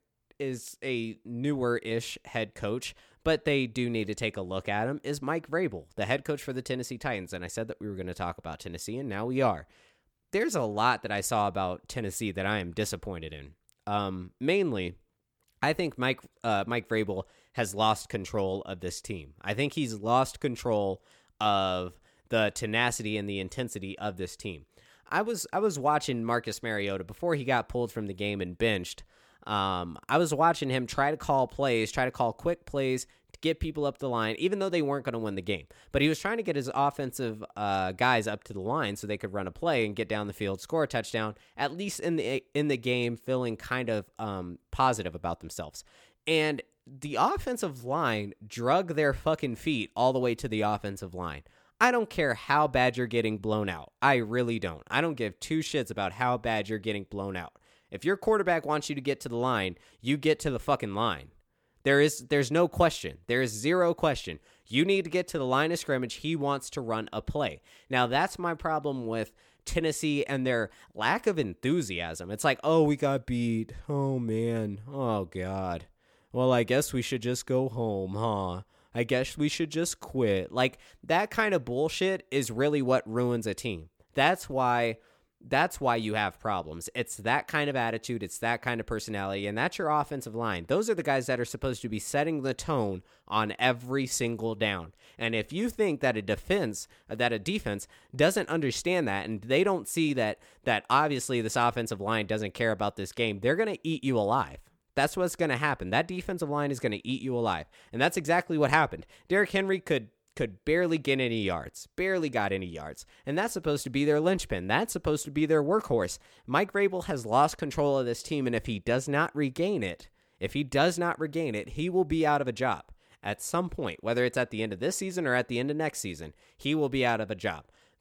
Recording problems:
none

